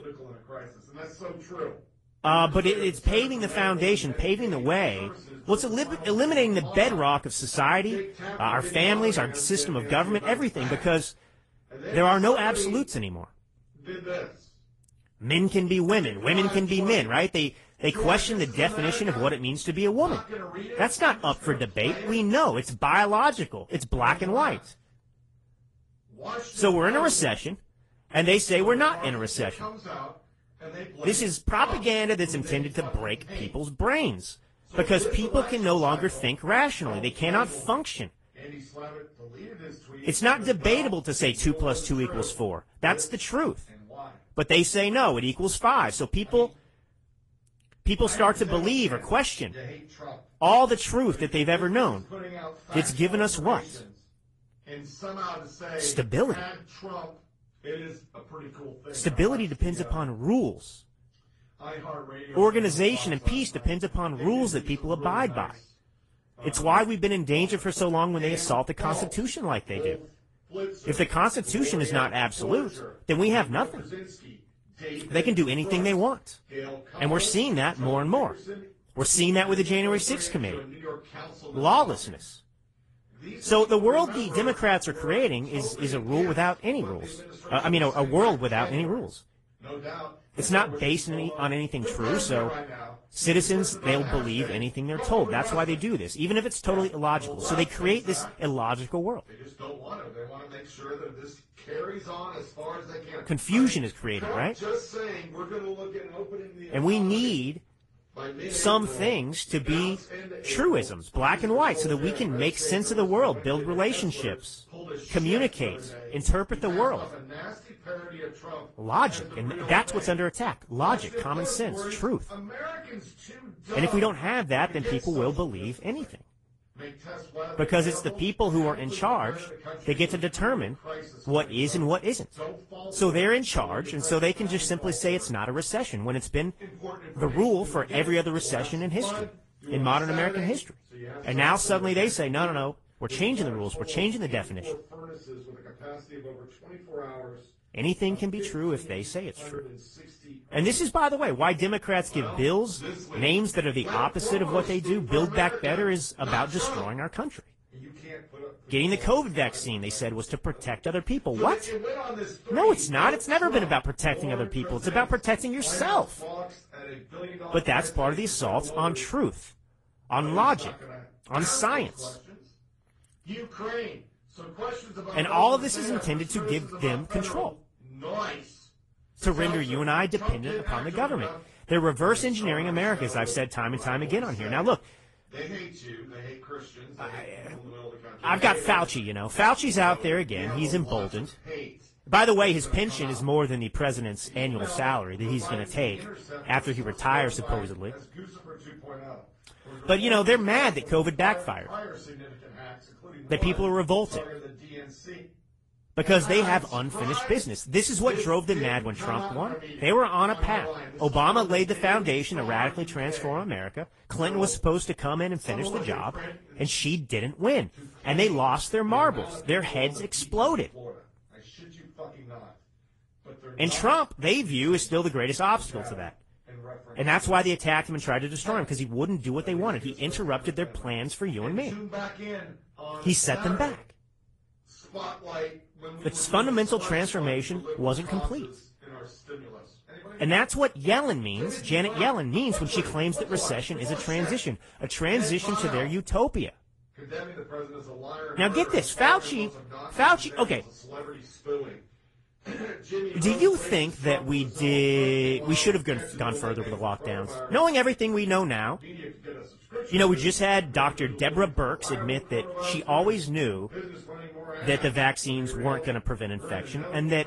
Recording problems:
garbled, watery; slightly; nothing above 10 kHz
voice in the background; noticeable; throughout; 15 dB below the speech

